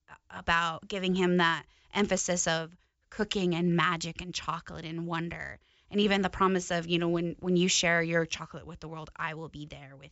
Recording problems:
high frequencies cut off; noticeable; nothing above 8 kHz

